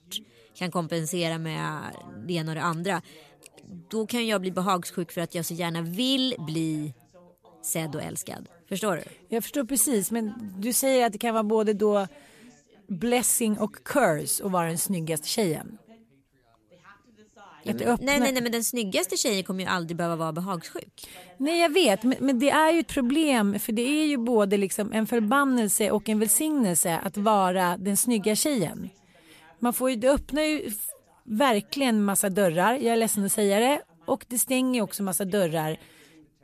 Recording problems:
background chatter; faint; throughout; 2 voices, 30 dB below the speech

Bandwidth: 14.5 kHz